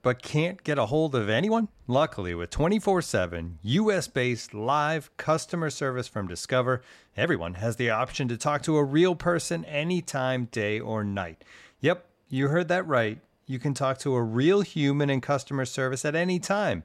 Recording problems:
uneven, jittery; strongly; from 0.5 to 16 s

